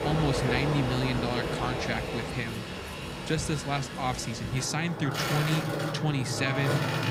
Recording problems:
train or aircraft noise; loud; throughout; 1 dB below the speech

